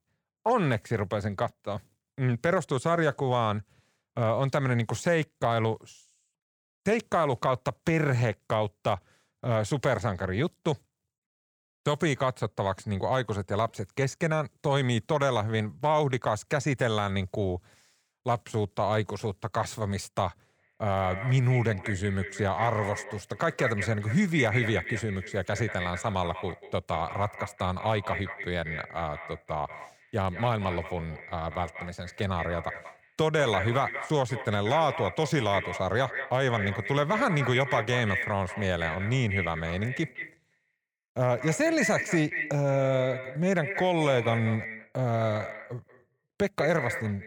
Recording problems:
echo of what is said; strong; from 21 s on; 190 ms later, 8 dB below the speech

